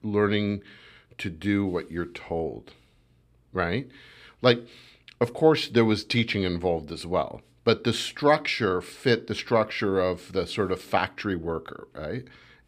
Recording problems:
none

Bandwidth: 15 kHz